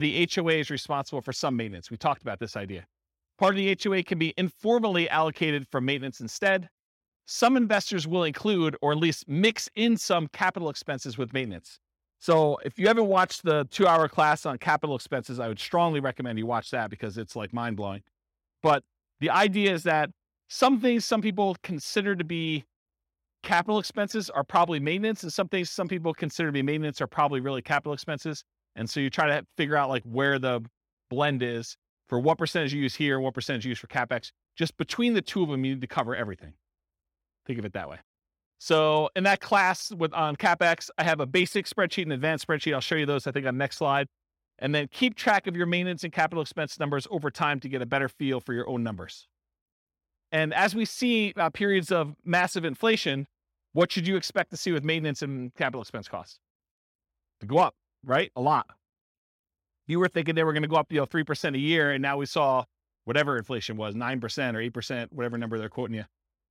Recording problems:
abrupt cut into speech; at the start

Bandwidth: 16.5 kHz